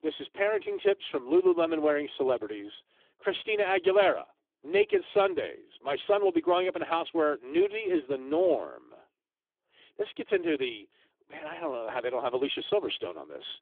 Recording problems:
phone-call audio; poor line; nothing above 3.5 kHz

